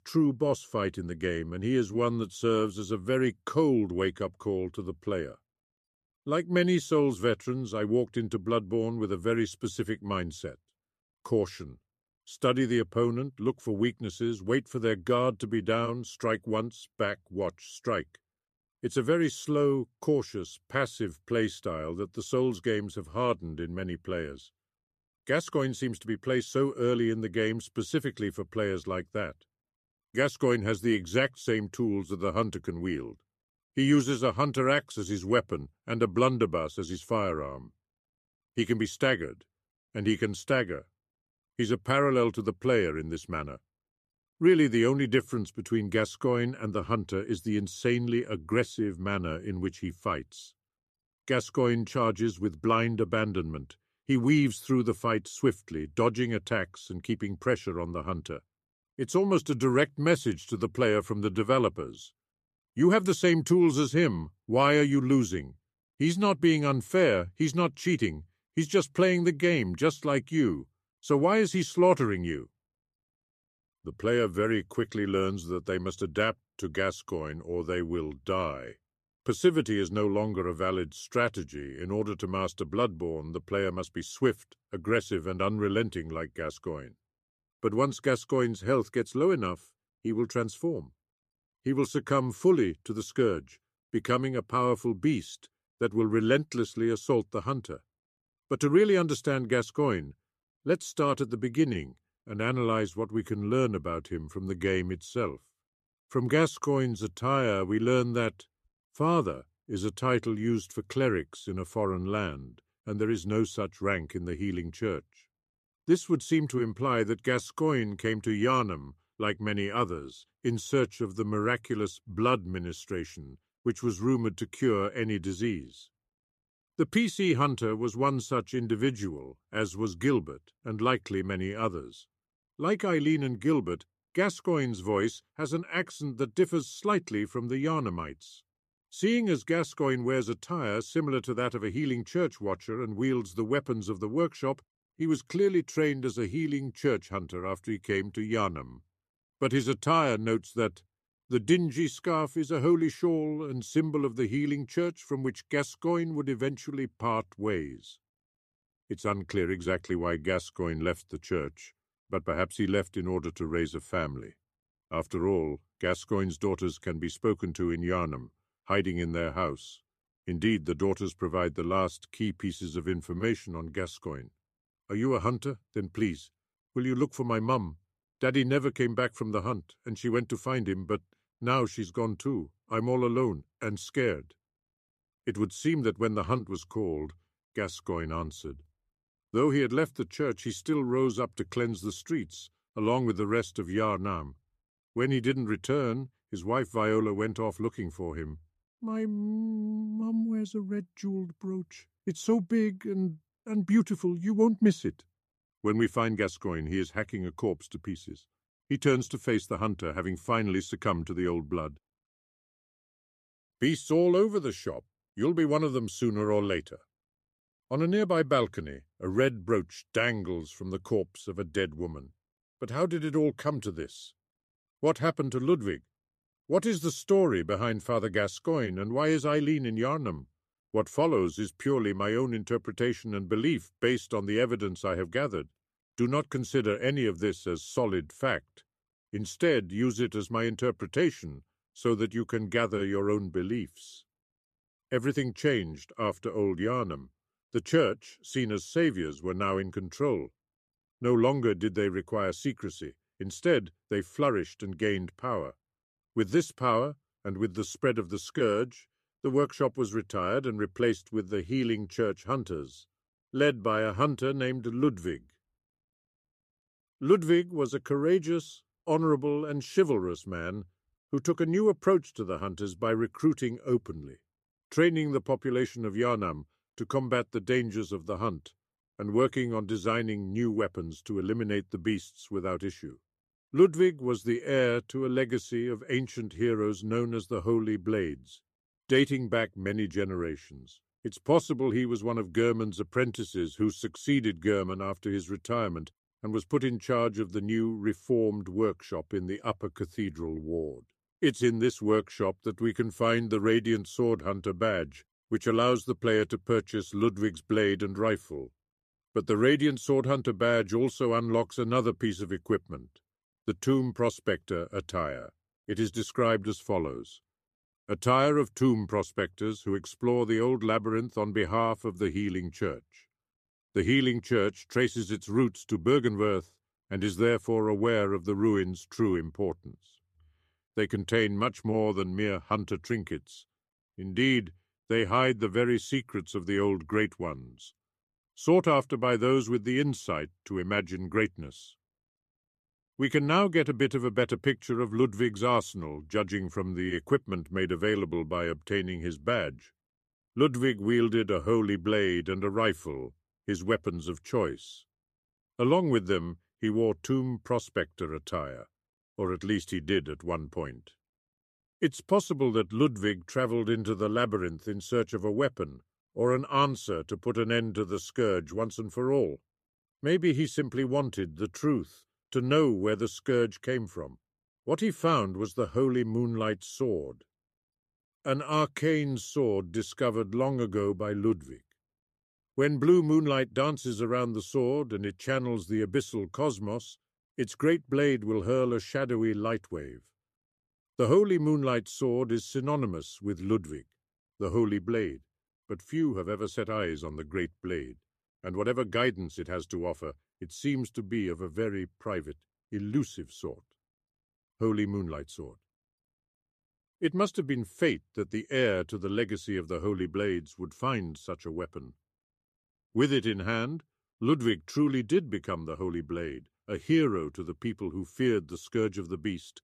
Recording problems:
none

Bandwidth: 14 kHz